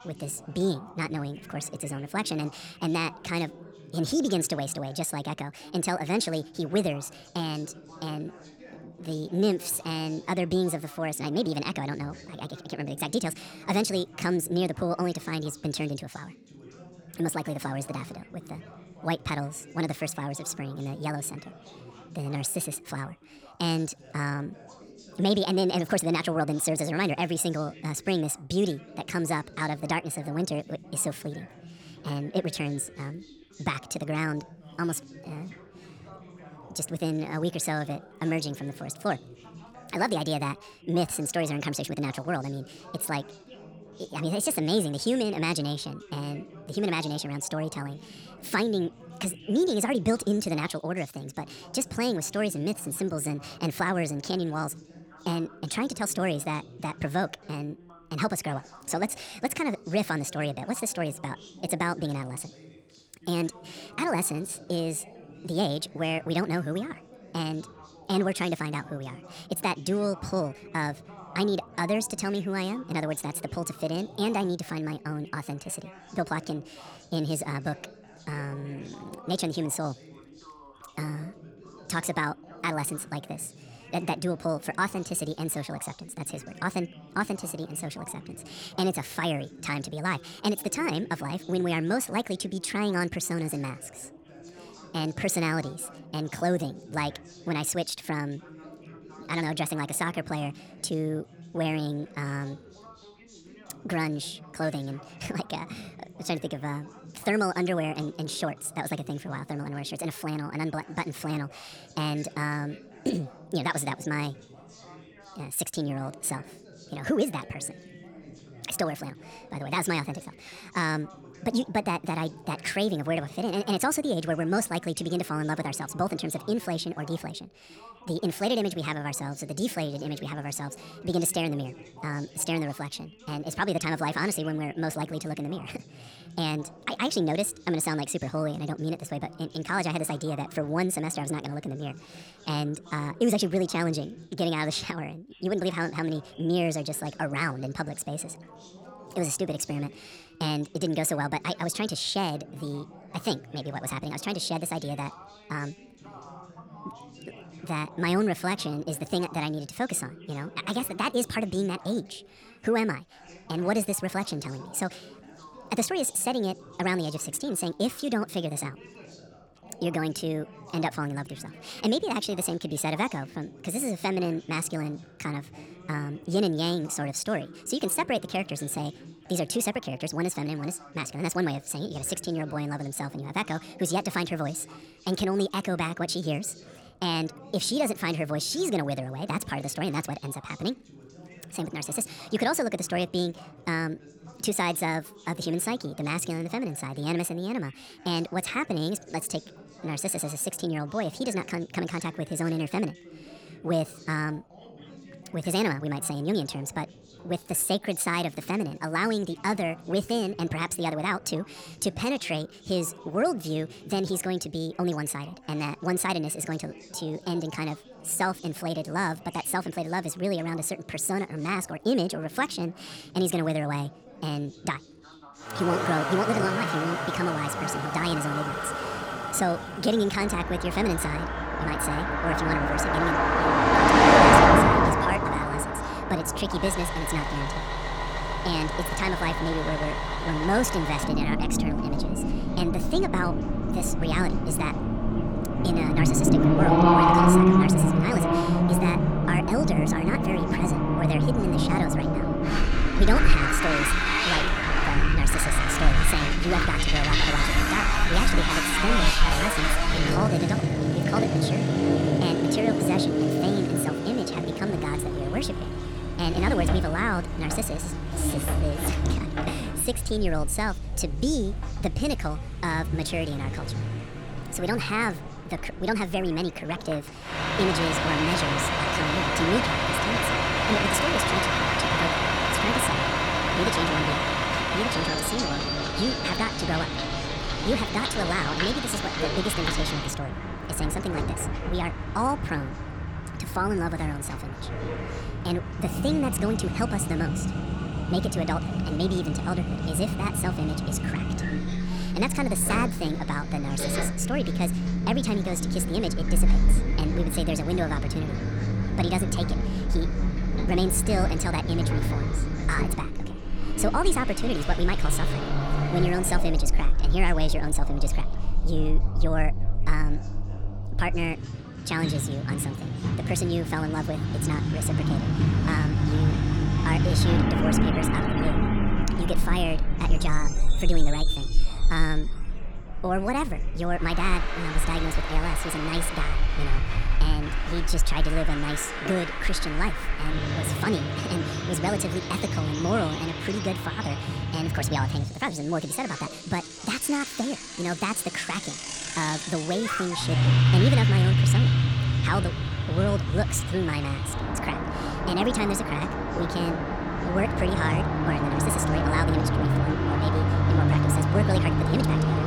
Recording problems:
wrong speed and pitch; too fast and too high; 1.5 times normal speed
traffic noise; very loud; from 3:46 on; 4 dB above the speech
background chatter; noticeable; throughout; 2 voices, 20 dB below the speech

